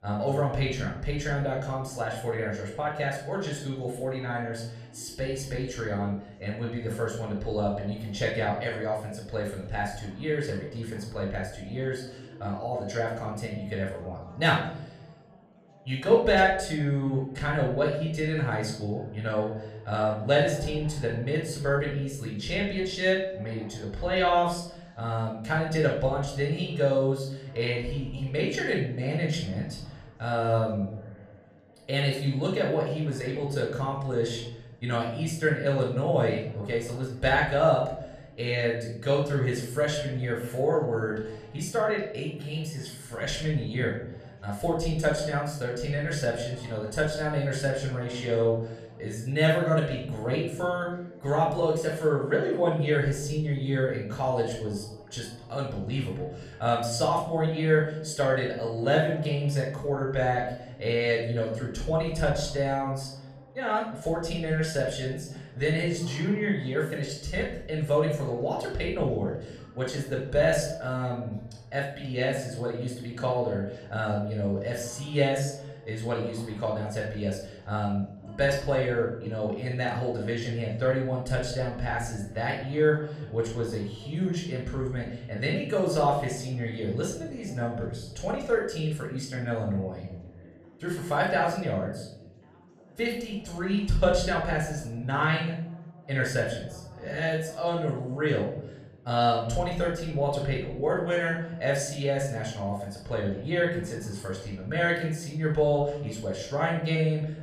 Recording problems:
off-mic speech; far
room echo; noticeable; dies away in 0.8 s
background chatter; faint; throughout; 3 voices, 25 dB below the speech

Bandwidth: 14 kHz